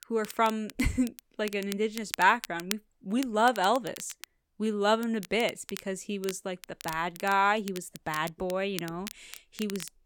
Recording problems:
crackle, like an old record; noticeable; 15 dB below the speech

